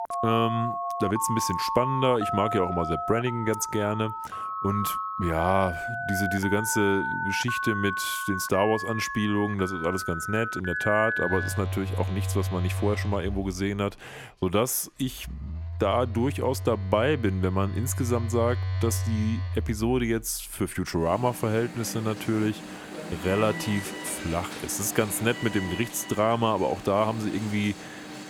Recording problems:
alarms or sirens; loud; throughout; 5 dB below the speech

